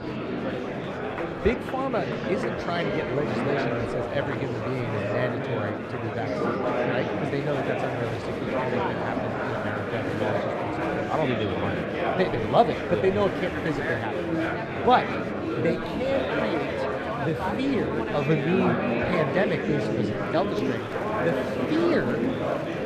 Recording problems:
muffled; slightly; fading above 3.5 kHz
murmuring crowd; very loud; throughout; 1 dB above the speech

